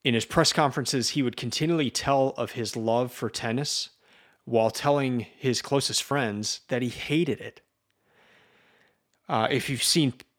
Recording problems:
uneven, jittery; slightly; from 5.5 to 10 s

